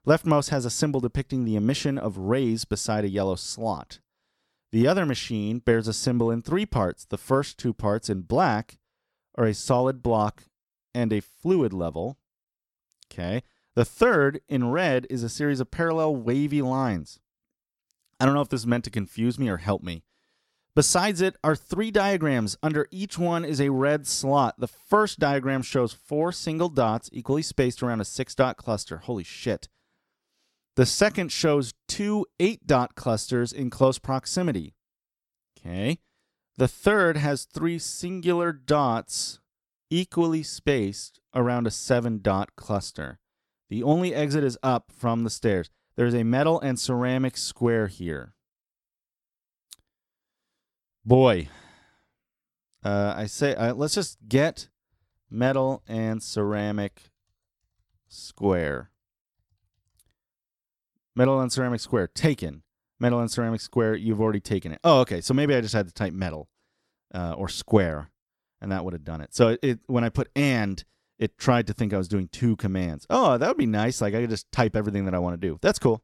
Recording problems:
none

